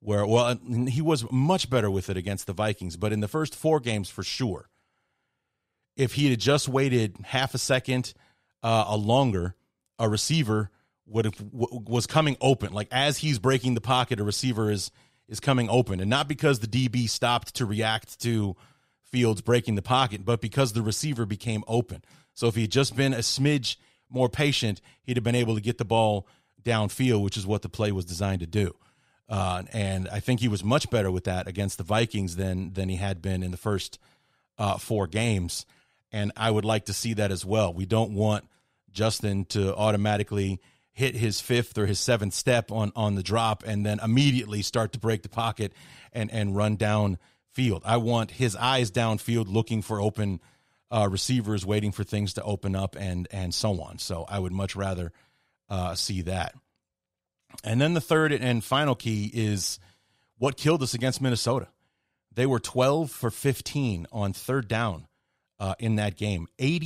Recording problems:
abrupt cut into speech; at the end

